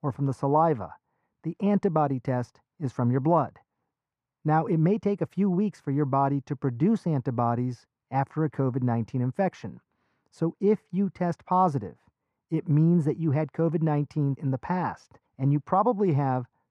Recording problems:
muffled; very; fading above 3 kHz

